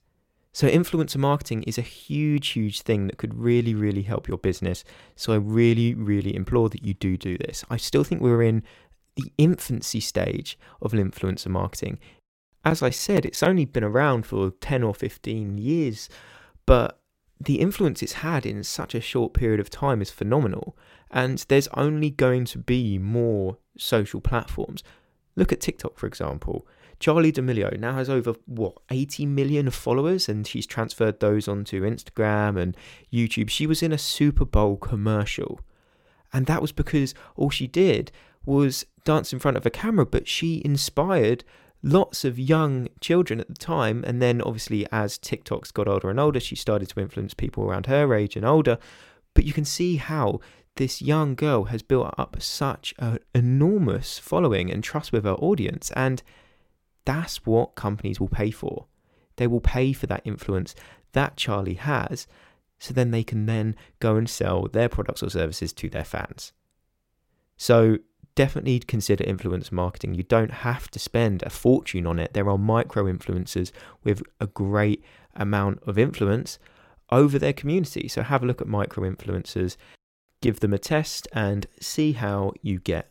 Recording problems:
none

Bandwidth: 16.5 kHz